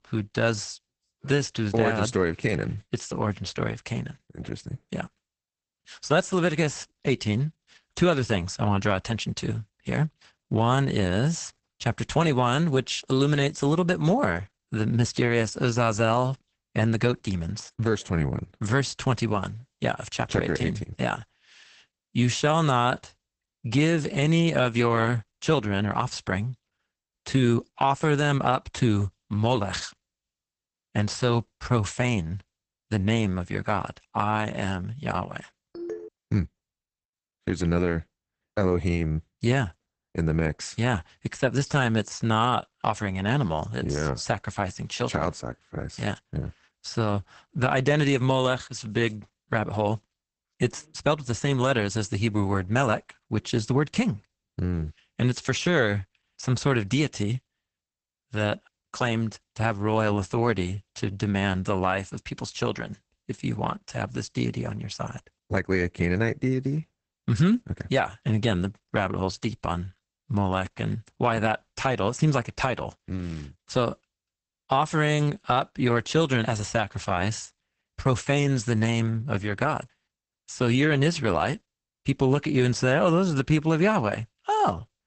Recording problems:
garbled, watery; badly; nothing above 8 kHz
phone ringing; faint; at 36 s; peak 10 dB below the speech

